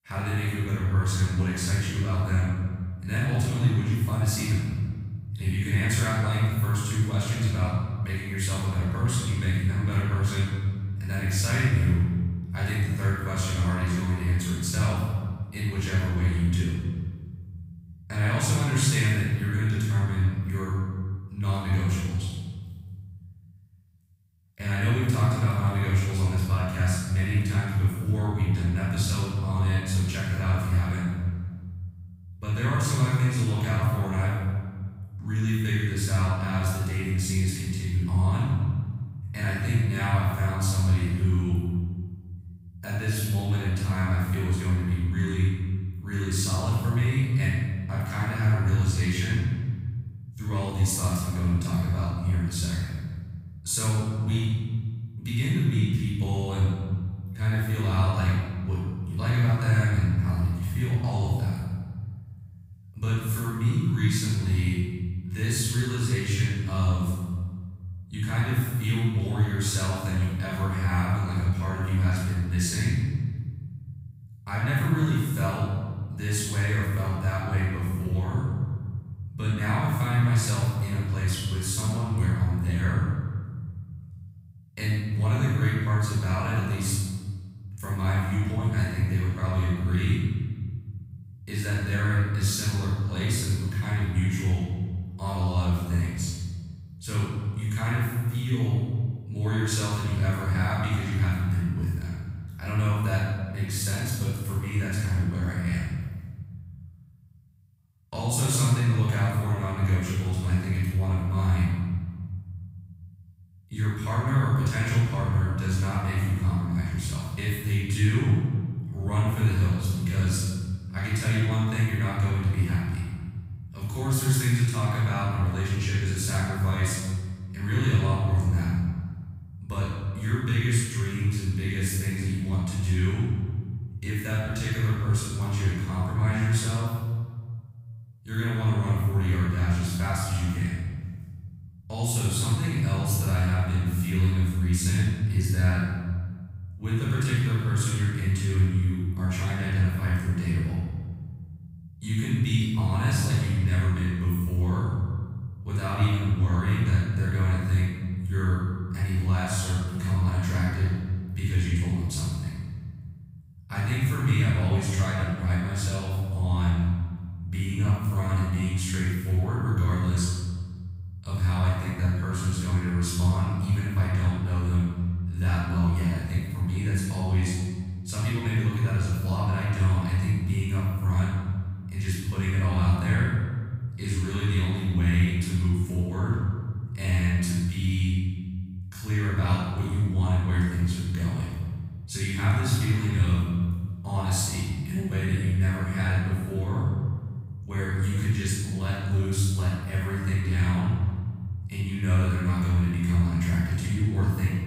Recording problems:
room echo; strong; dies away in 1.9 s
off-mic speech; far

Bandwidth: 15.5 kHz